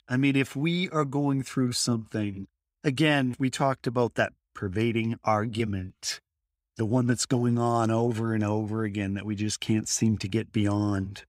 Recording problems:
none

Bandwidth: 15.5 kHz